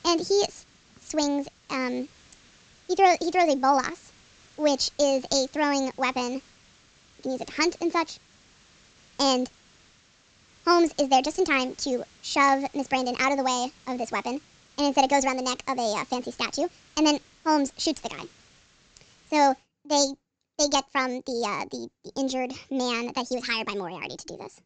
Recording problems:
wrong speed and pitch; too fast and too high; 1.5 times normal speed
high frequencies cut off; noticeable; nothing above 8 kHz
hiss; faint; until 20 s; 30 dB below the speech

